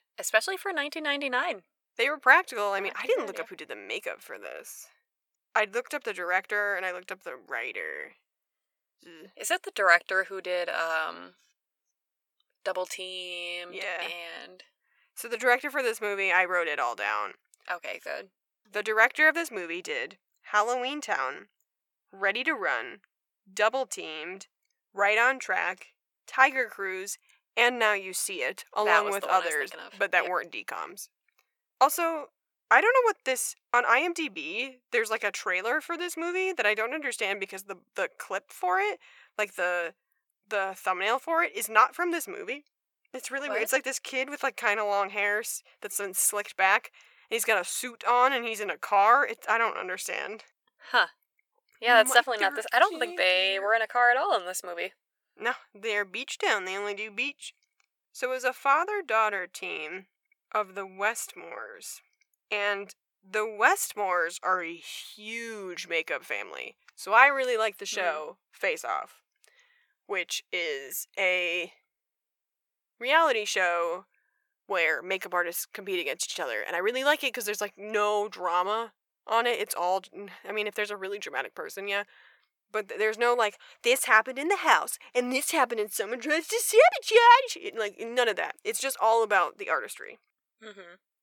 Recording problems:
thin; very; fading below 600 Hz

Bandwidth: 18.5 kHz